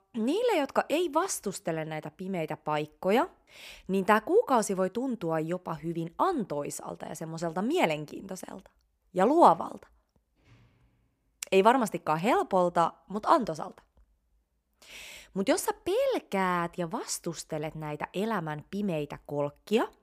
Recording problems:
none

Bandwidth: 15 kHz